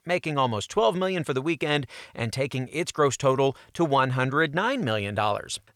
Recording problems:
none

